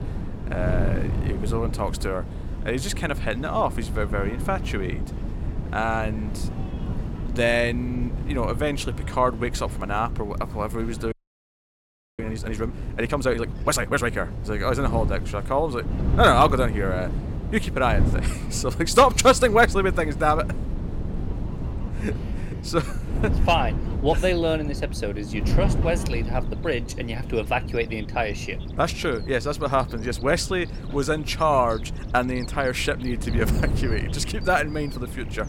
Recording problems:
wind noise on the microphone; occasional gusts; 15 dB below the speech
animal sounds; faint; throughout; 25 dB below the speech
crowd noise; faint; throughout; 30 dB below the speech
audio freezing; at 11 s for 1 s

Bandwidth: 16.5 kHz